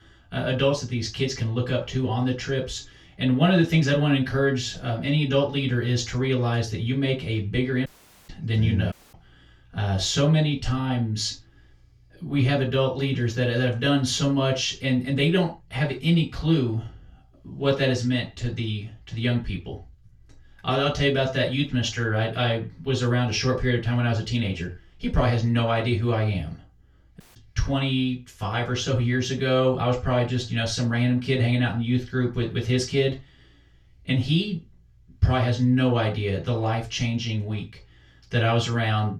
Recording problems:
off-mic speech; far
room echo; slight; dies away in 0.2 s
audio cutting out; at 8 s, at 9 s and at 27 s

